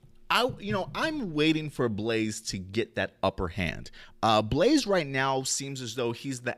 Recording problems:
none

